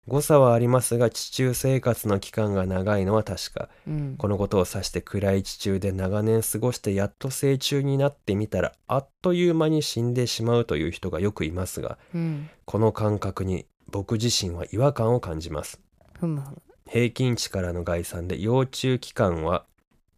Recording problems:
none

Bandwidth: 14.5 kHz